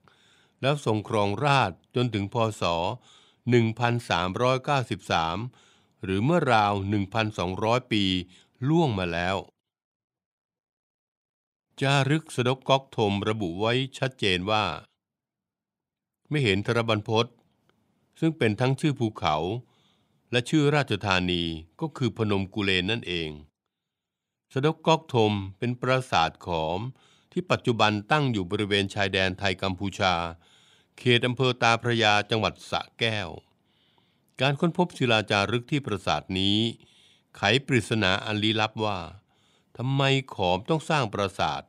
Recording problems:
none

